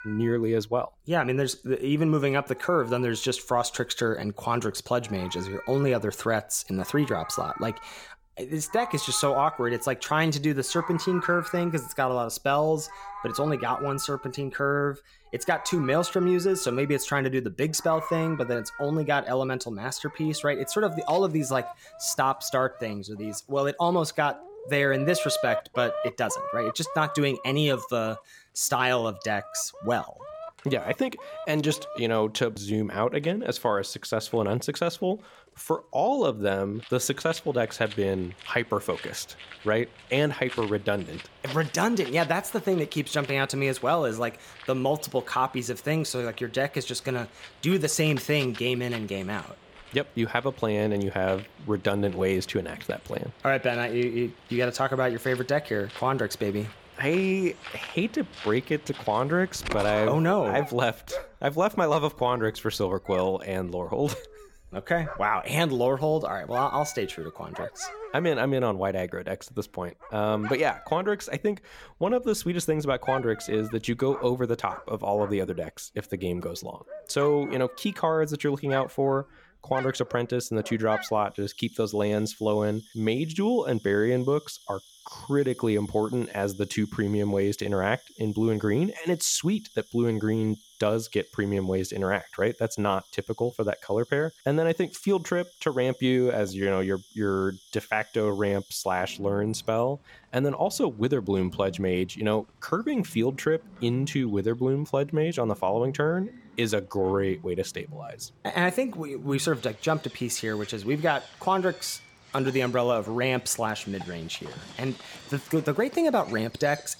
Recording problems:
animal sounds; noticeable; throughout; 15 dB below the speech

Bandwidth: 17.5 kHz